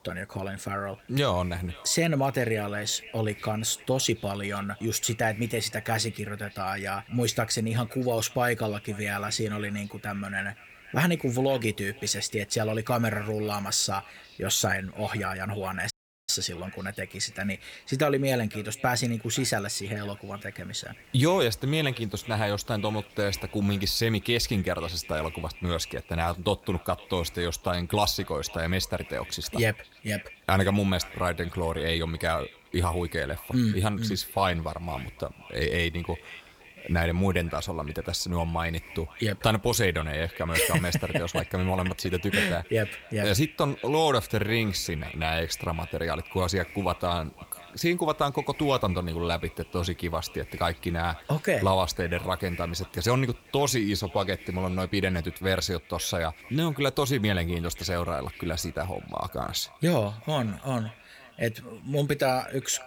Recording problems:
echo of what is said; faint; throughout; 520 ms later, 20 dB below the speech
hiss; faint; throughout; 25 dB below the speech
audio cutting out; at 16 s

